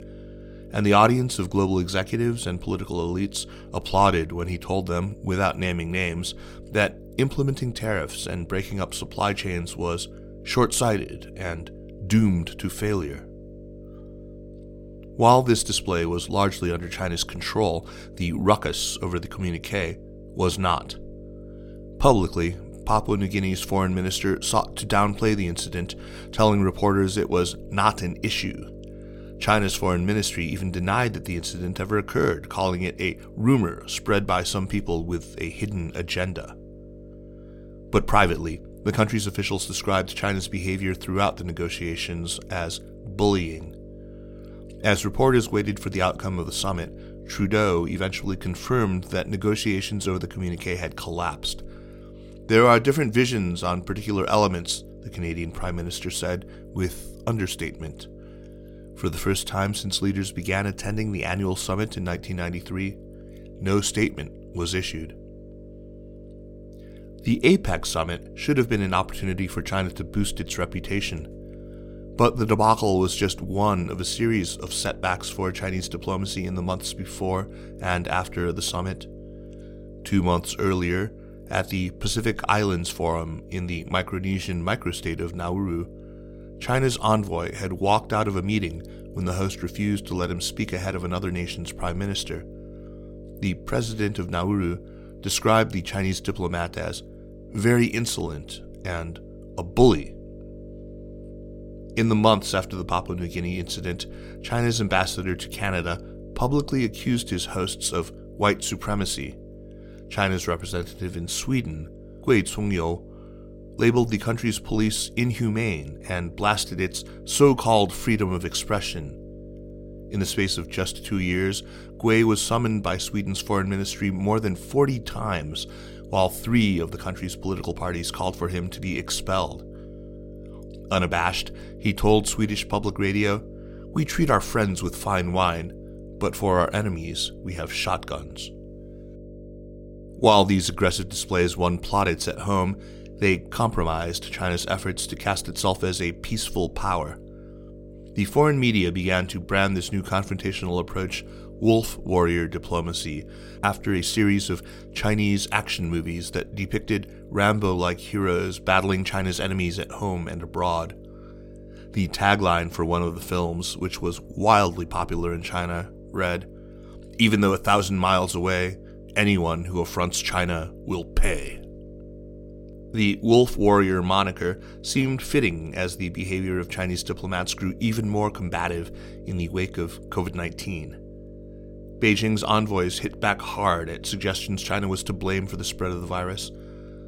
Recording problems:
electrical hum; faint; throughout; 50 Hz, 20 dB below the speech

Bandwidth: 16 kHz